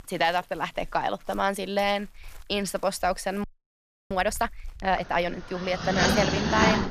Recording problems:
animal sounds; very loud; throughout; 2 dB above the speech
audio freezing; at 3.5 s for 0.5 s

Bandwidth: 14.5 kHz